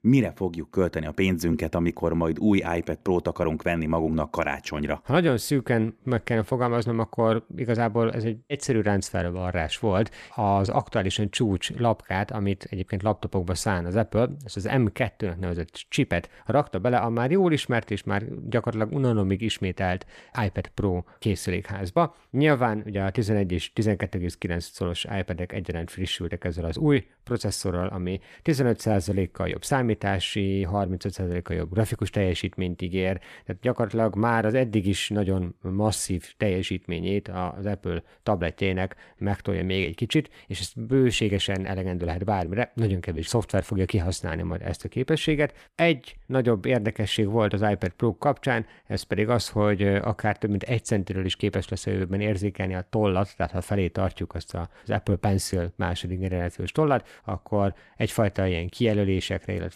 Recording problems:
none

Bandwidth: 14.5 kHz